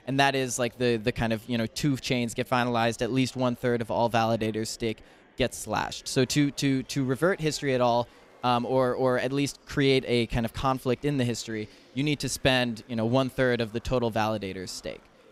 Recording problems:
murmuring crowd; faint; throughout; 30 dB below the speech

